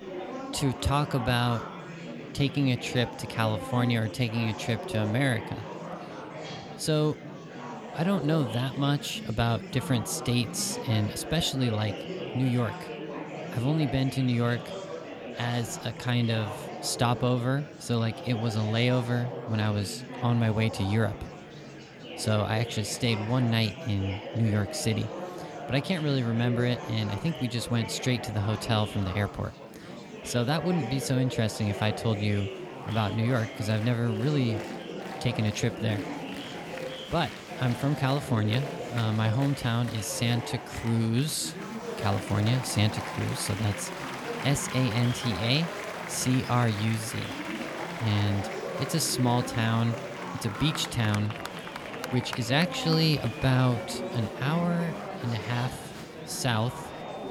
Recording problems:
murmuring crowd; loud; throughout; 9 dB below the speech

